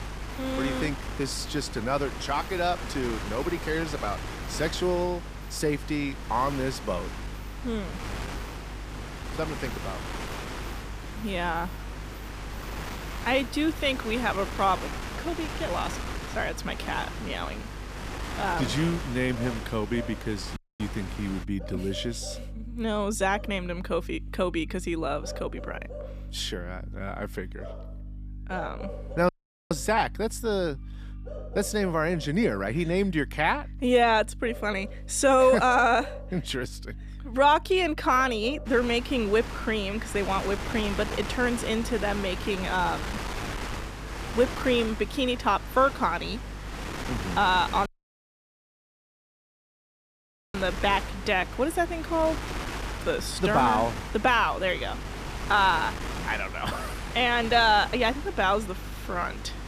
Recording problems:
wind noise on the microphone; occasional gusts; until 21 s and from 39 s on; 10 dB below the speech
electrical hum; faint; throughout; 50 Hz, 30 dB below the speech
animal sounds; faint; throughout; 20 dB below the speech
audio cutting out; at 21 s, at 29 s and at 48 s for 2.5 s

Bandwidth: 14.5 kHz